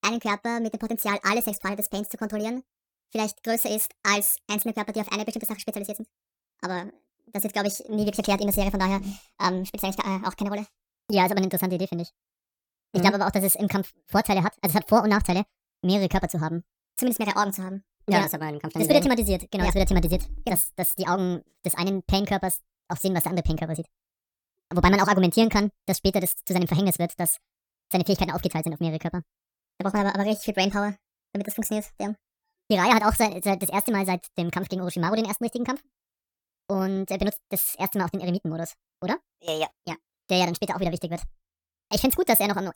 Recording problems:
wrong speed and pitch; too fast and too high; 1.6 times normal speed

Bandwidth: 19 kHz